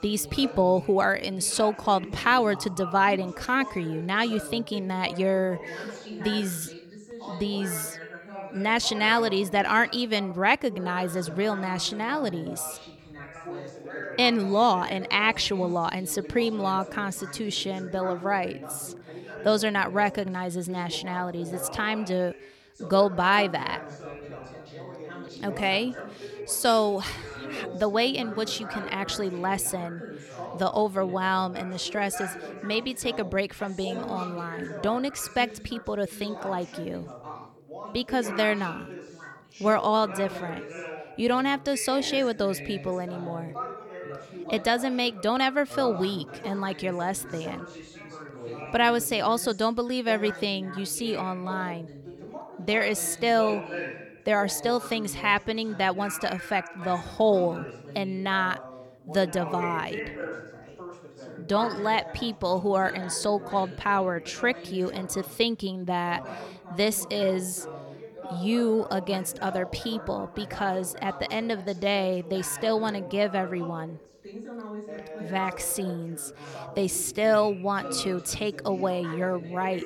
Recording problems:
background chatter; noticeable; throughout; 3 voices, 15 dB below the speech

